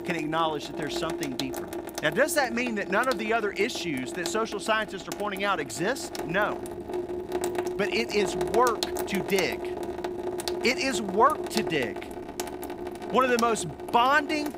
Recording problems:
household noises; loud; throughout; 7 dB below the speech

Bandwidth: 15.5 kHz